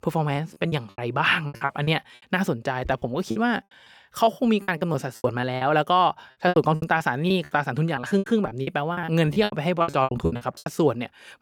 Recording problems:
choppy; very; from 0.5 to 2 s, from 3 to 5.5 s and from 6.5 to 11 s; 21% of the speech affected

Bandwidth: 18.5 kHz